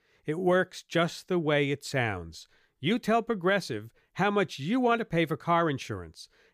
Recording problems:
none

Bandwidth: 15 kHz